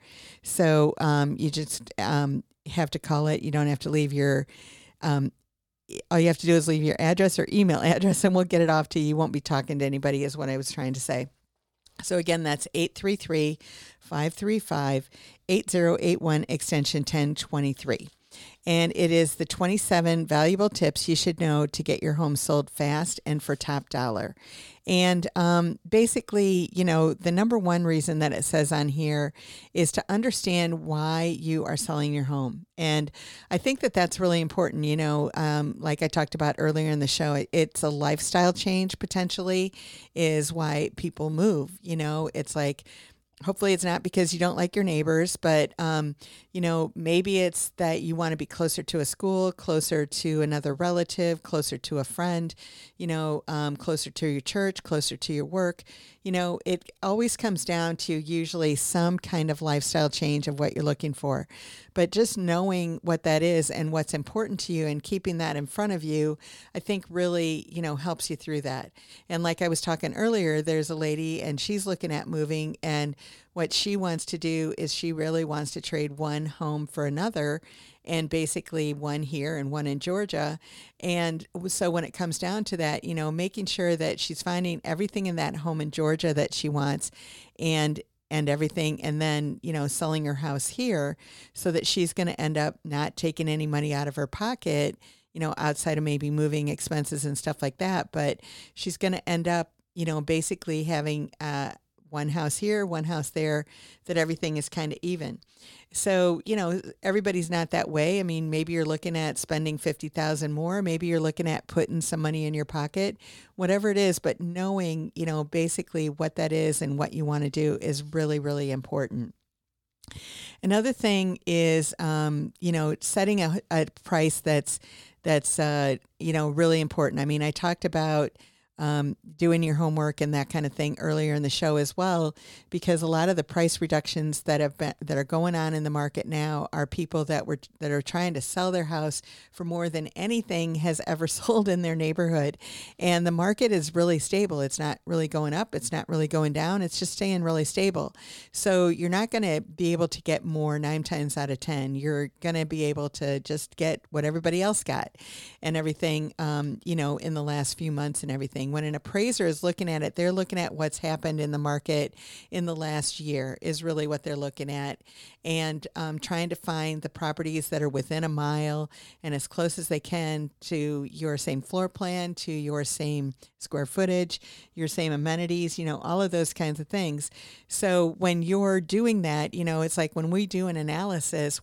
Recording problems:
none

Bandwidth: 18 kHz